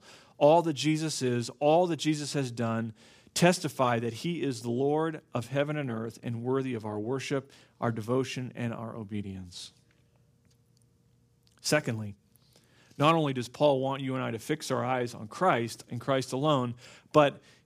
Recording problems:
none

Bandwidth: 15 kHz